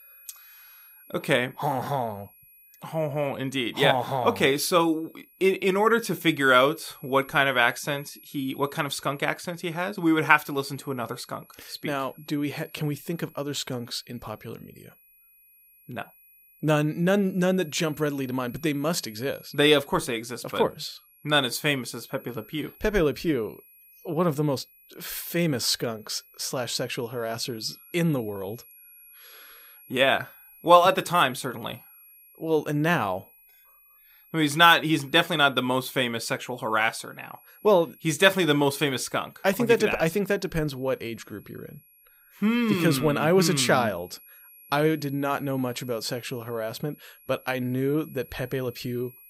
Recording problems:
high-pitched whine; faint; throughout; 11.5 kHz, 25 dB below the speech

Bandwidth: 15.5 kHz